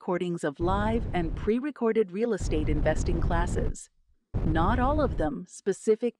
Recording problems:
wind noise on the microphone; occasional gusts; at 0.5 s, from 2.5 to 3.5 s and at 4.5 s; 15 dB below the speech

